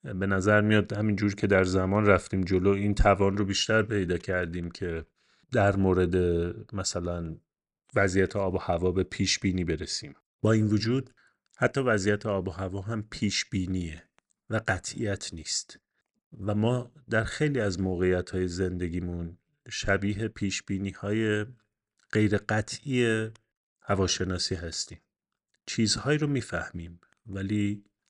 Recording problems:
none

